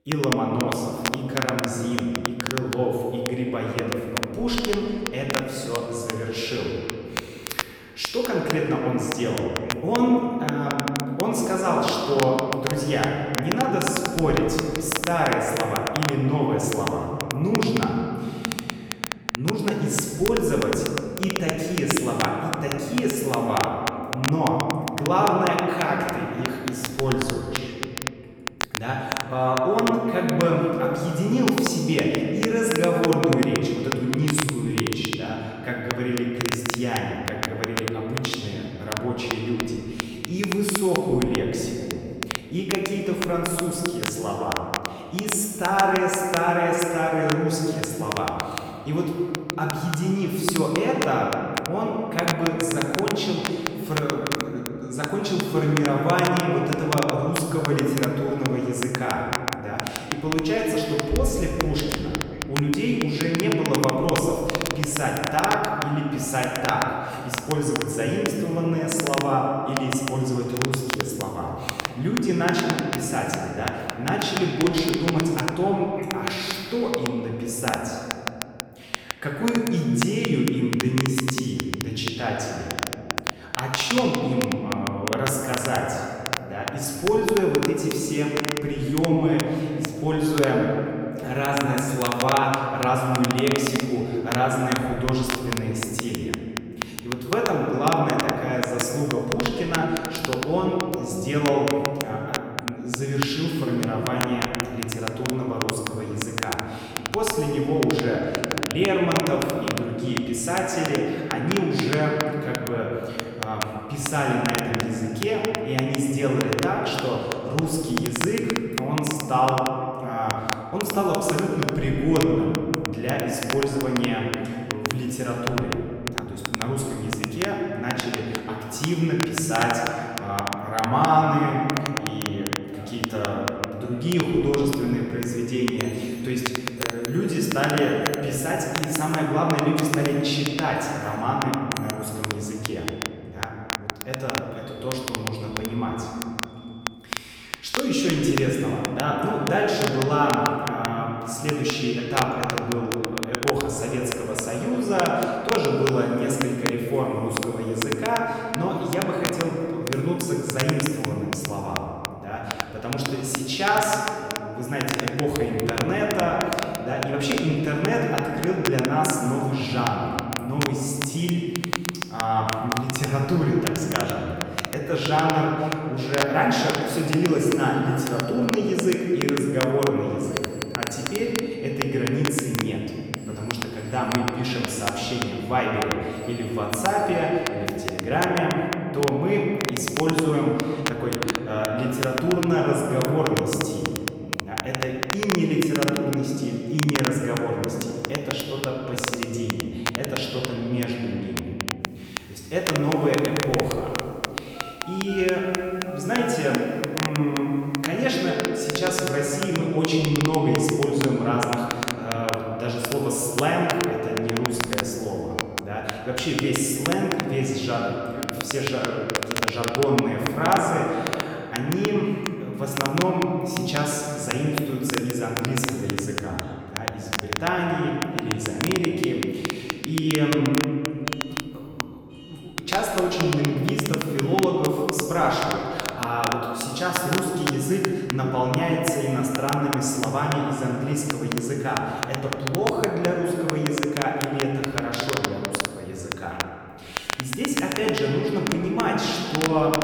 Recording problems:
off-mic speech; far
room echo; noticeable; dies away in 2.4 s
alarms or sirens; very faint; from 2:10 on; 20 dB below the speech
crackle, like an old record; very faint; 7 dB below the speech

